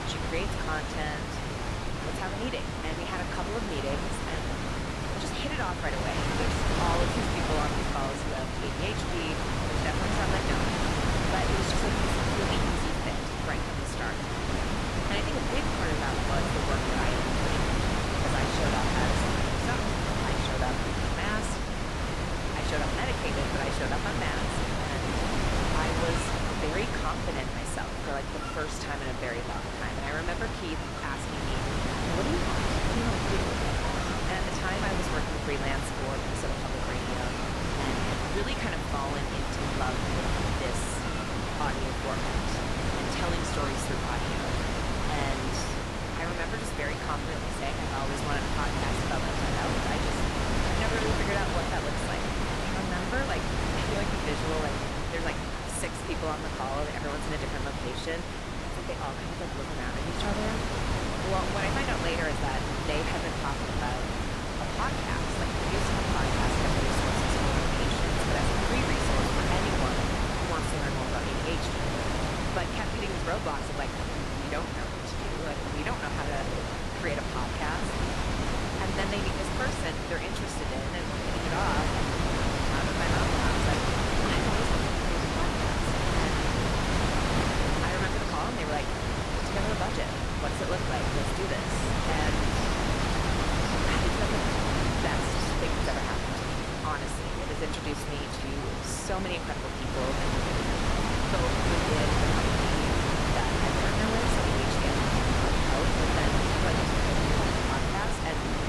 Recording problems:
garbled, watery; slightly; nothing above 11 kHz
wind noise on the microphone; heavy; 4 dB above the speech
animal sounds; noticeable; throughout; 15 dB below the speech

